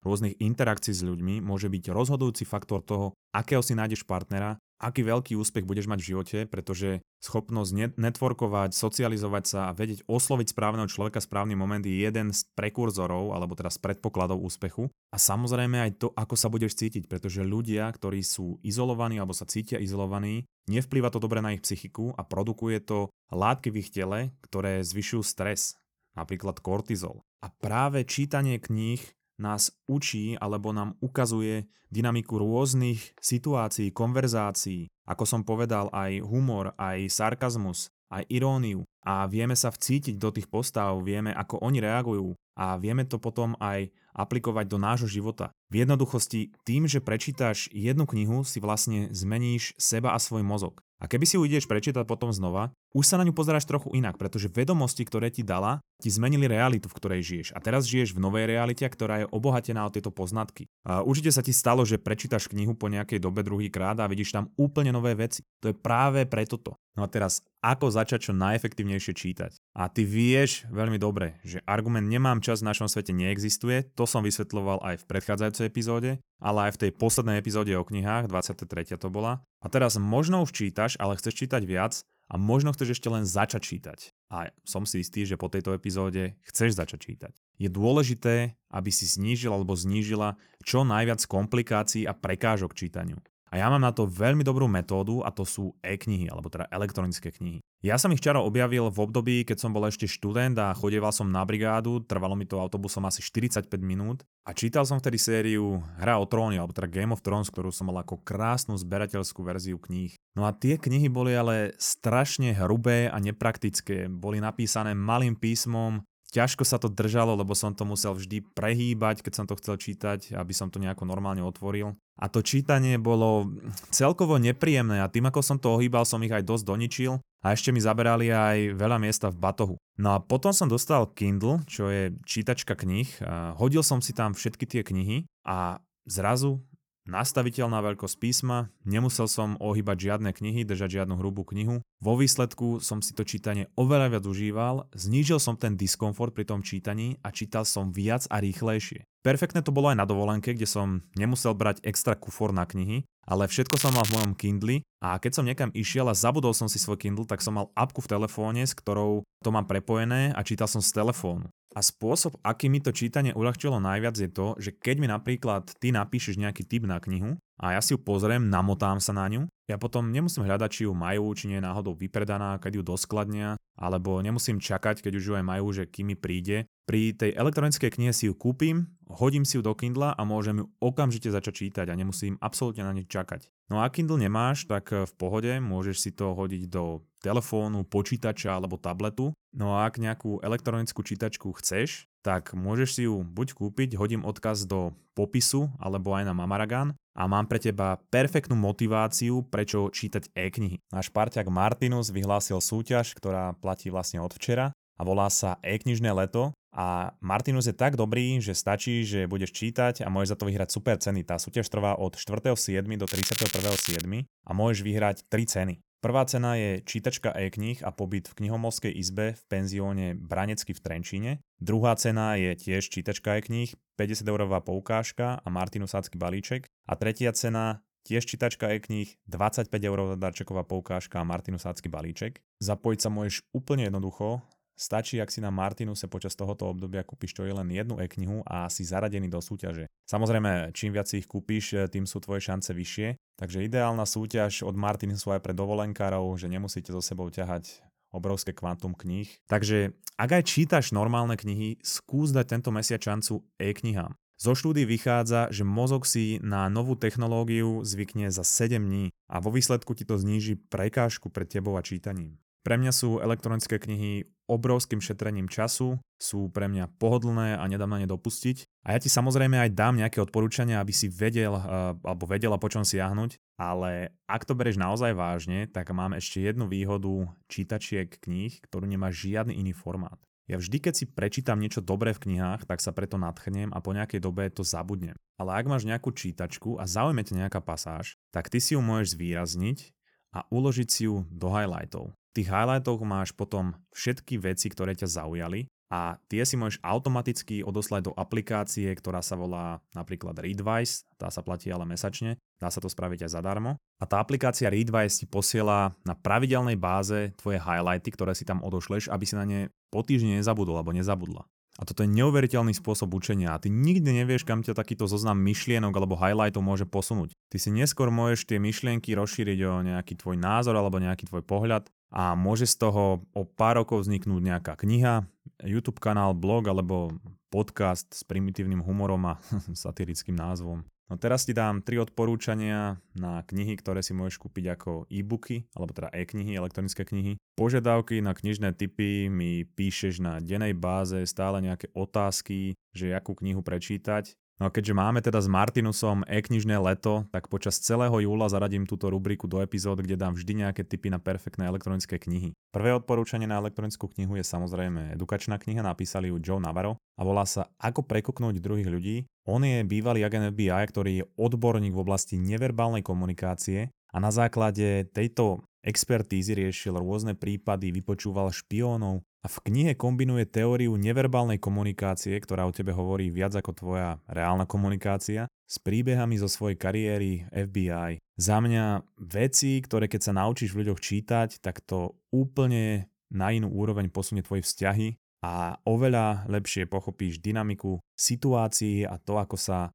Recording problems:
crackling; loud; at 2:34 and at 3:33; 2 dB below the speech

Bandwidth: 18.5 kHz